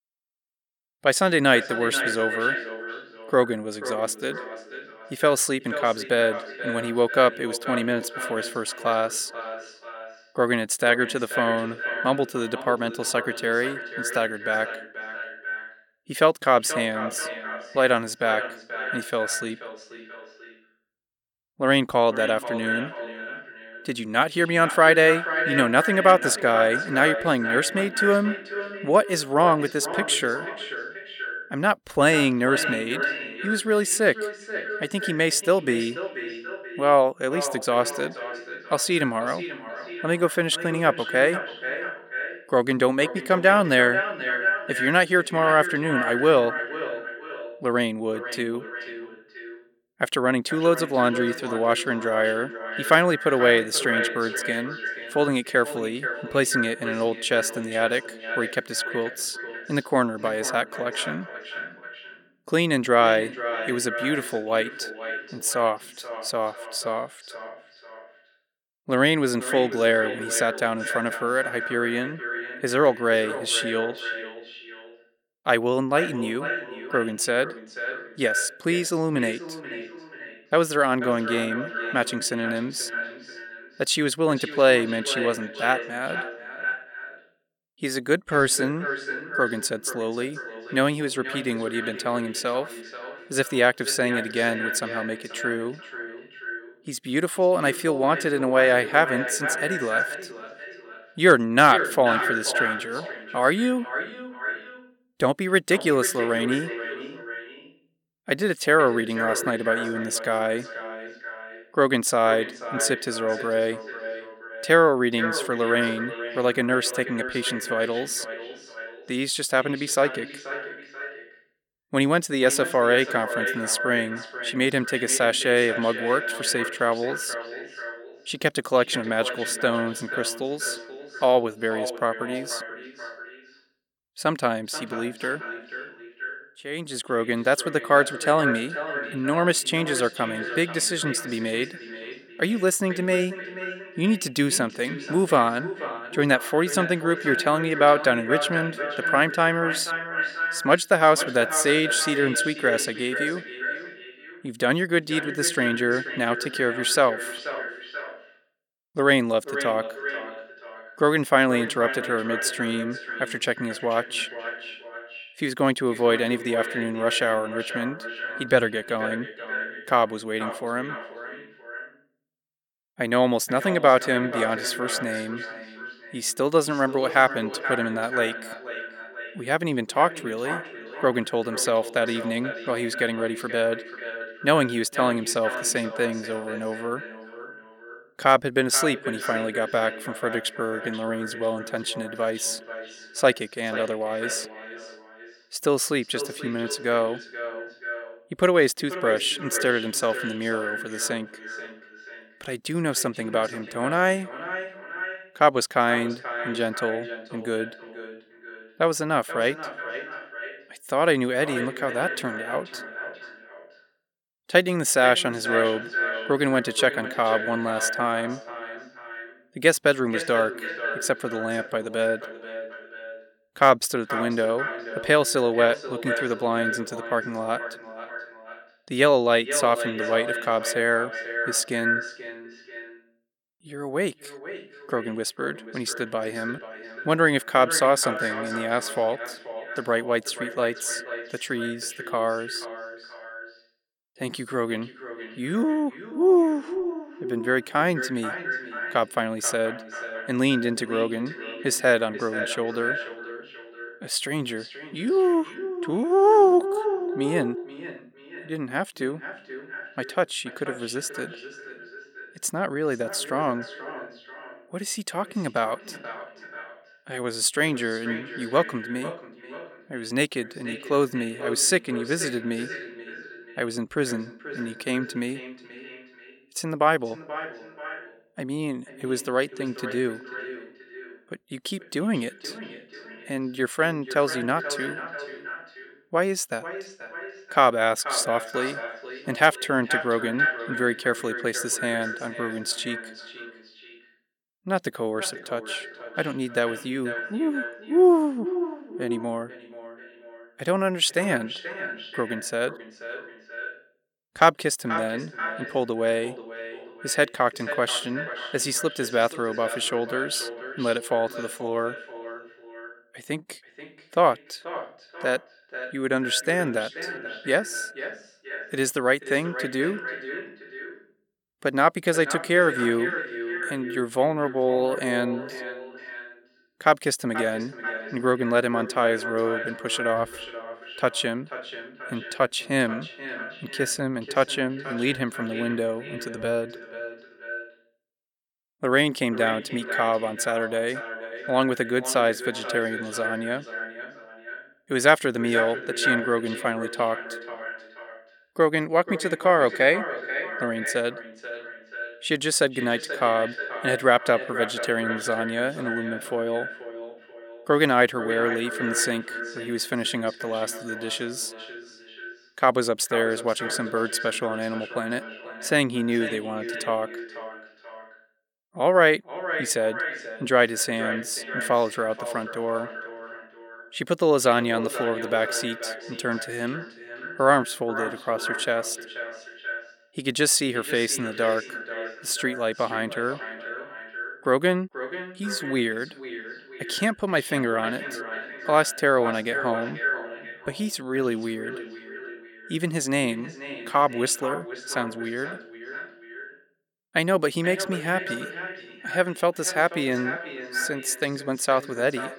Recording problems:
echo of what is said; strong; throughout; 480 ms later, 9 dB below the speech

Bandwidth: 18 kHz